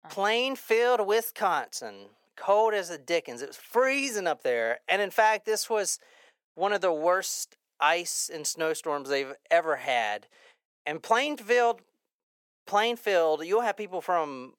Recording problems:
thin; somewhat; fading below 500 Hz

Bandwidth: 17 kHz